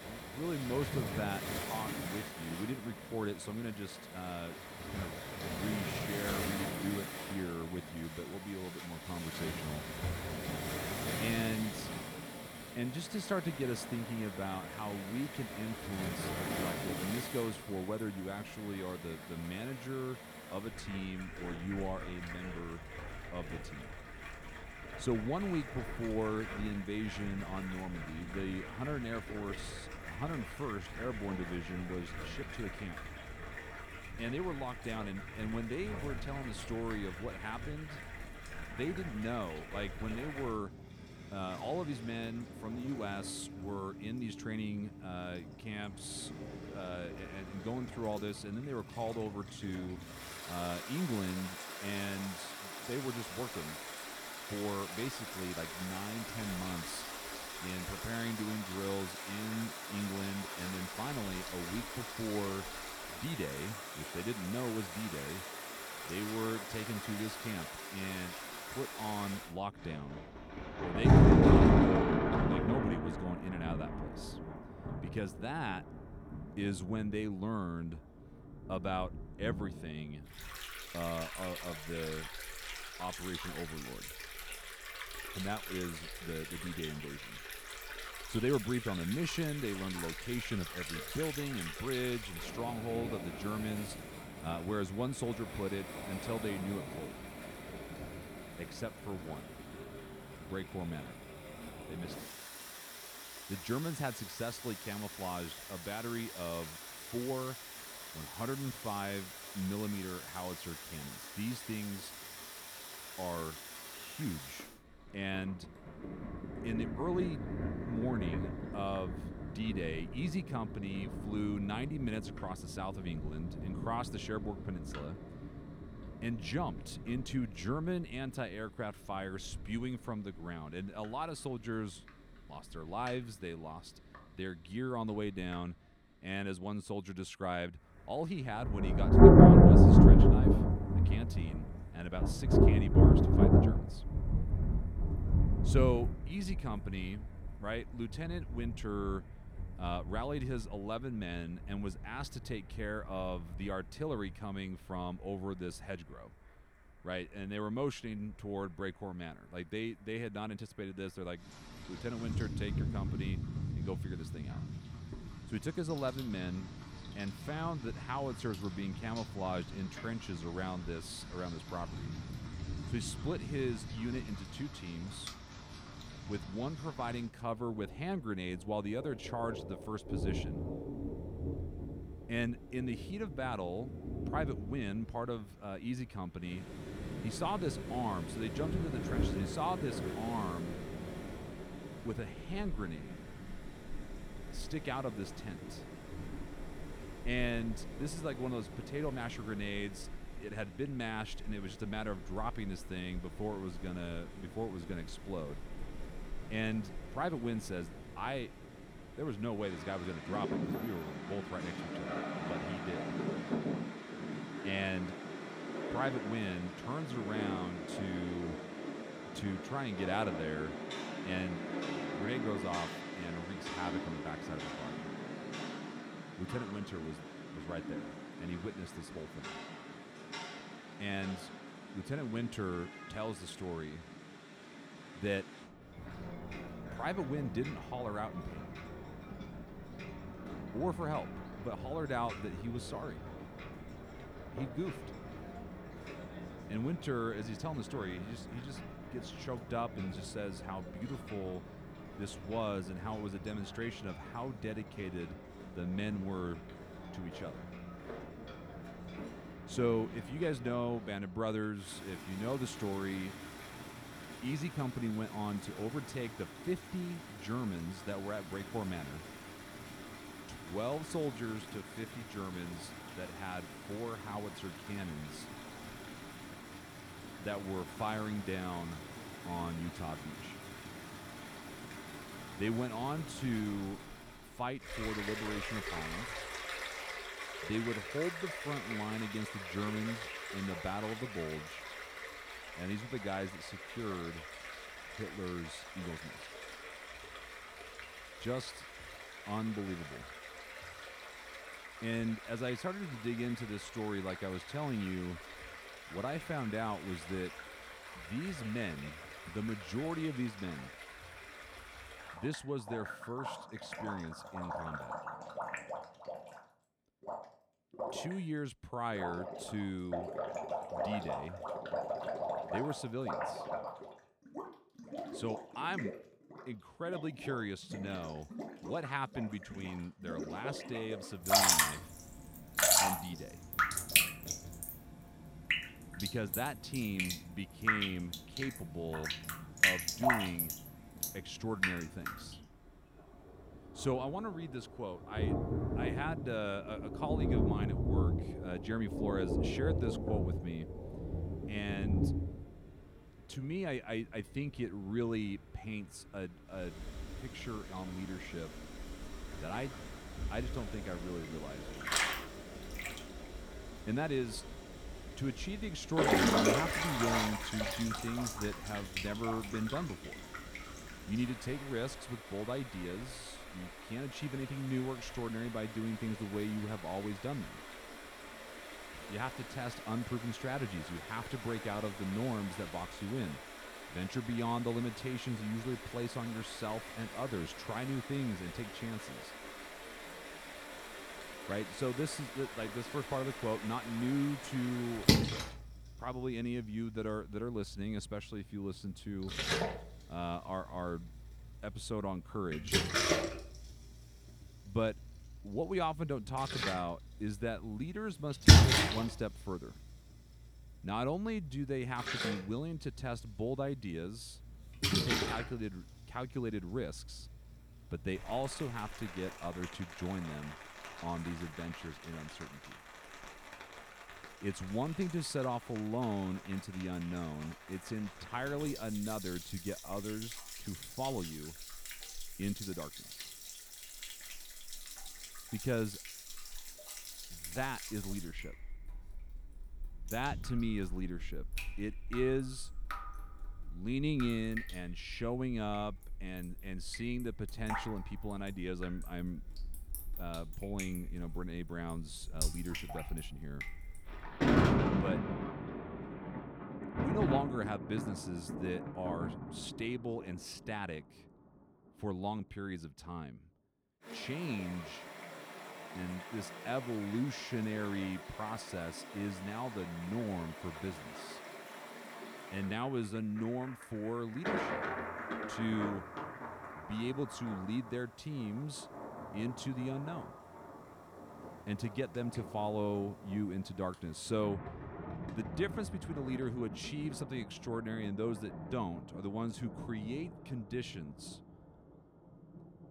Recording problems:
rain or running water; very loud; throughout; 3 dB above the speech

